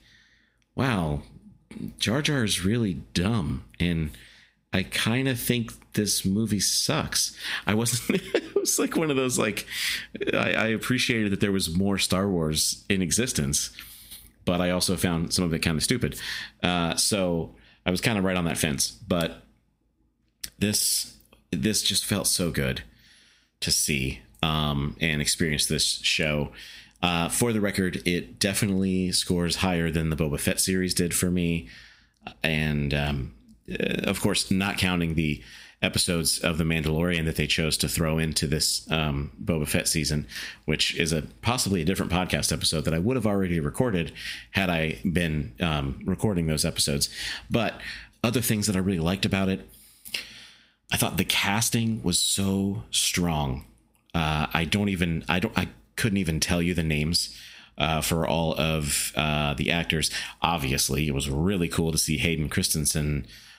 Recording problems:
squashed, flat; somewhat

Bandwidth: 15.5 kHz